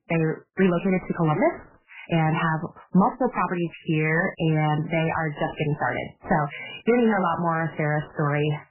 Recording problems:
garbled, watery; badly; nothing above 3 kHz
distortion; slight; 10 dB below the speech
uneven, jittery; strongly; from 0.5 to 8 s

